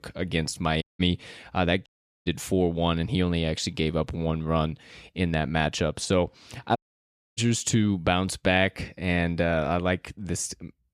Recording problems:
audio cutting out; at 1 s, at 2 s and at 7 s for 0.5 s

